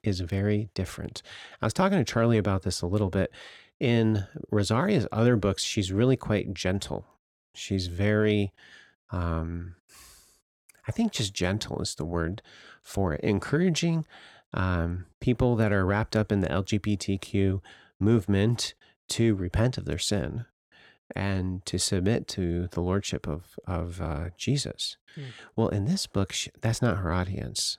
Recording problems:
none

